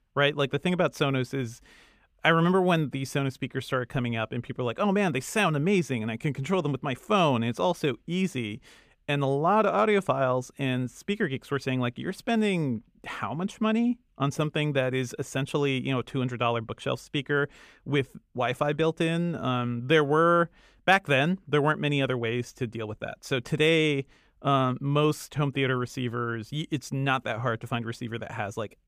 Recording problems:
none

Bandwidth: 15 kHz